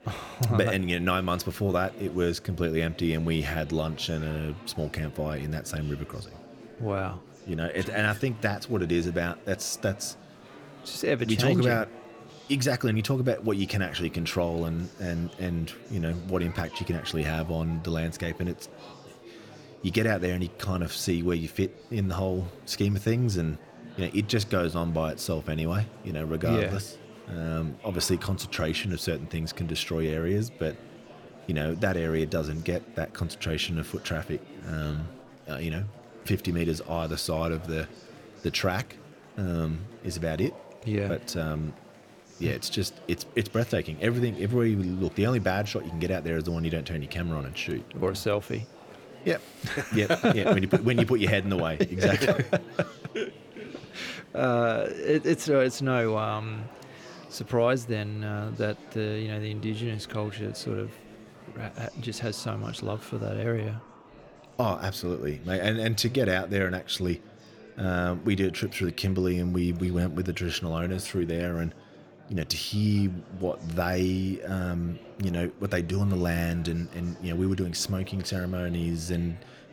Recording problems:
murmuring crowd; noticeable; throughout; 20 dB below the speech

